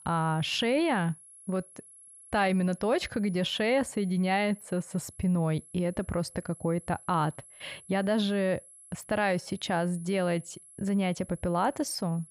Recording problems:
high-pitched whine; faint; throughout; 11 kHz, 20 dB below the speech

